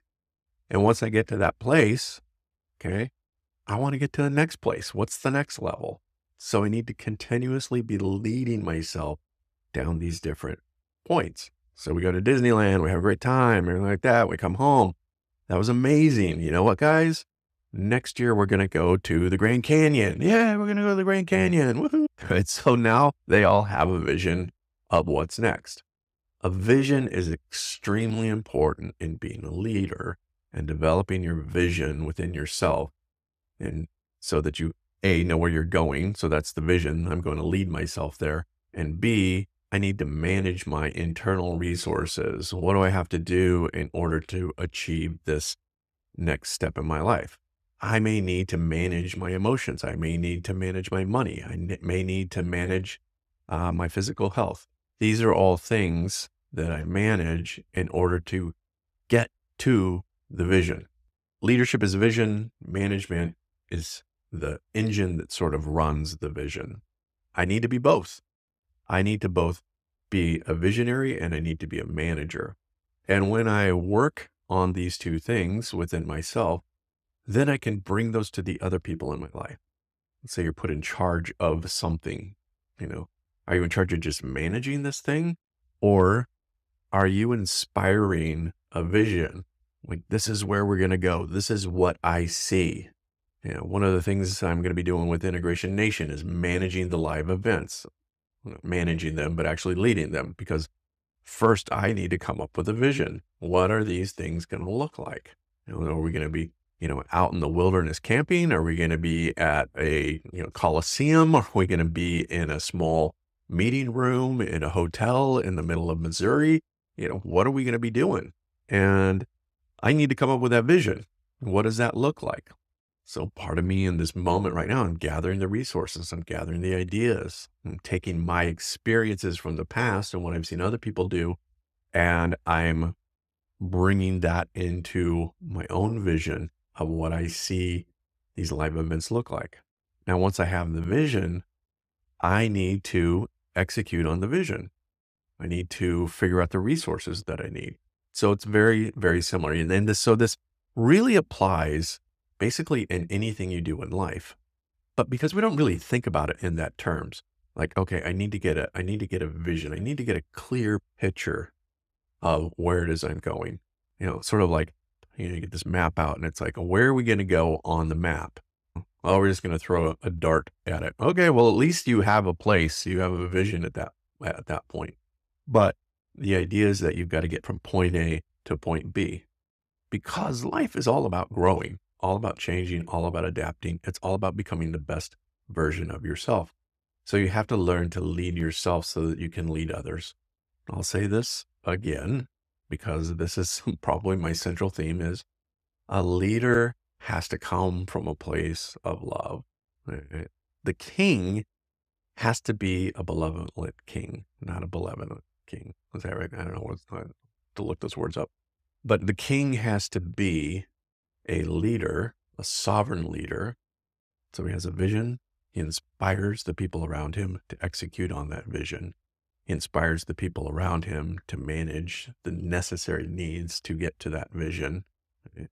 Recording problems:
none

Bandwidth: 15 kHz